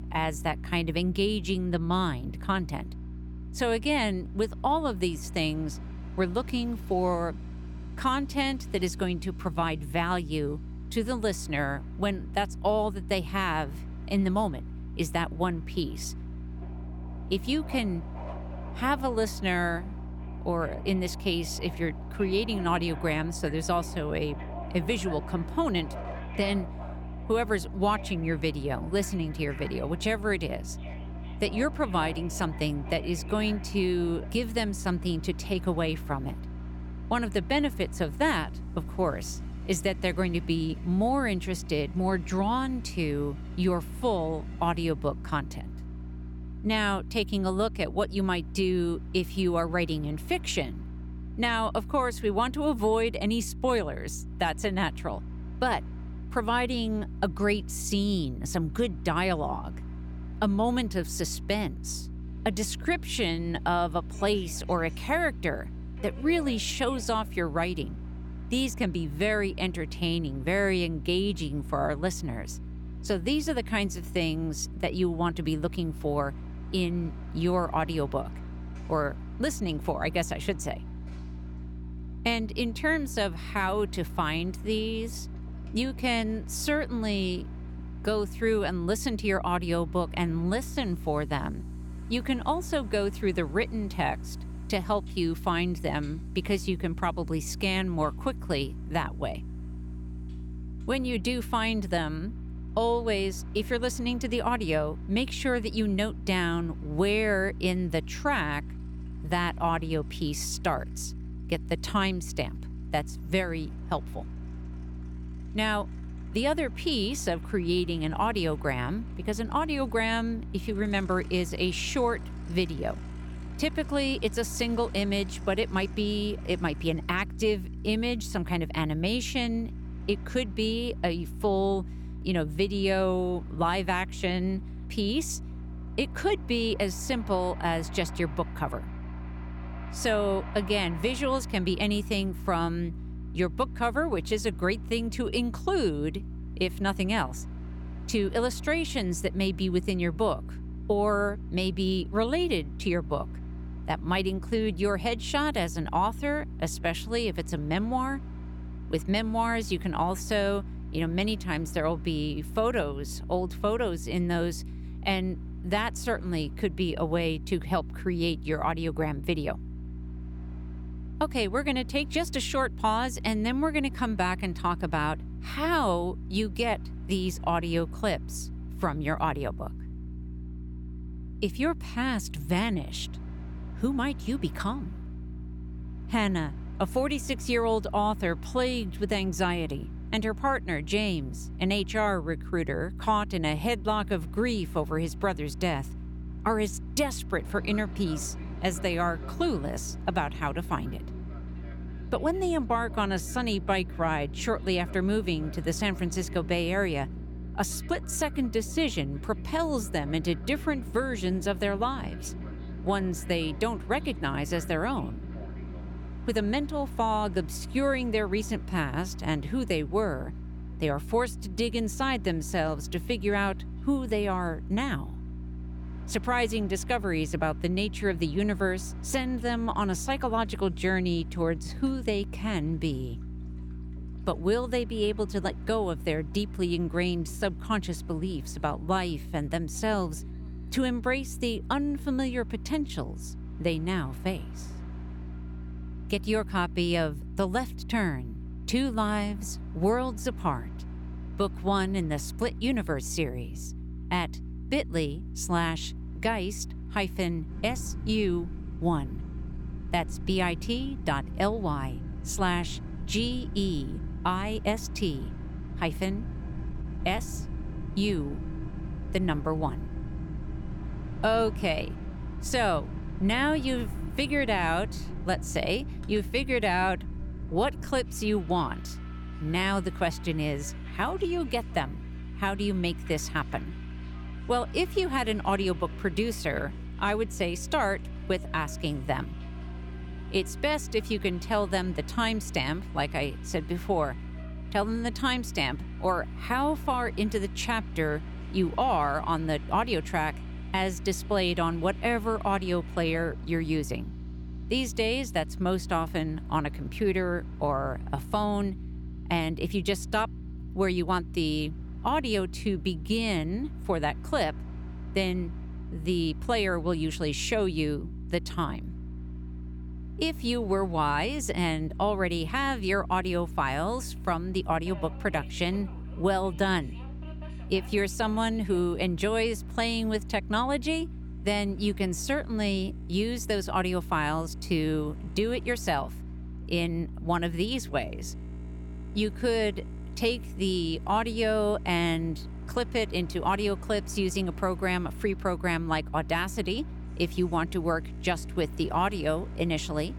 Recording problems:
train or aircraft noise; noticeable; throughout; 20 dB below the speech
electrical hum; faint; throughout; 60 Hz, 20 dB below the speech

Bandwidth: 18.5 kHz